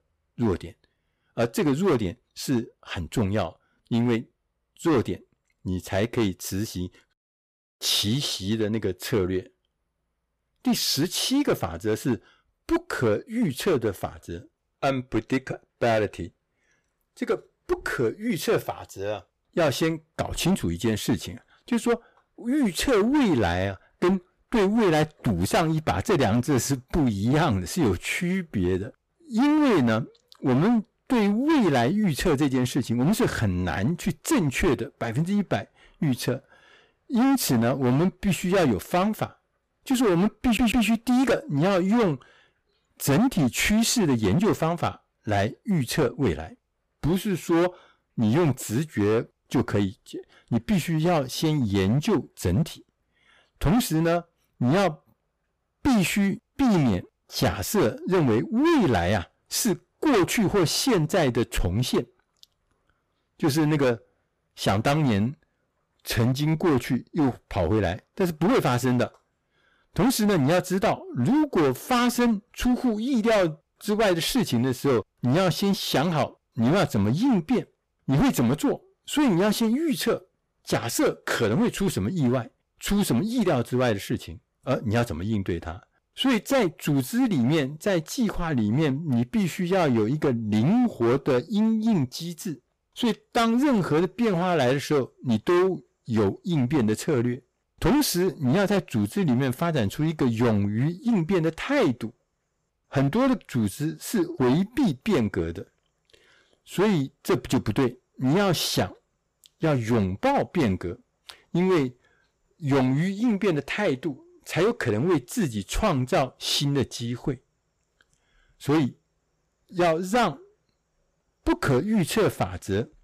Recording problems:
distortion; heavy; 13% of the sound clipped
audio stuttering; at 40 s

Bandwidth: 15 kHz